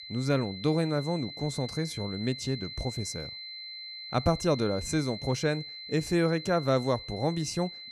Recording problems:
high-pitched whine; loud; throughout; 4 kHz, 10 dB below the speech

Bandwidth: 14 kHz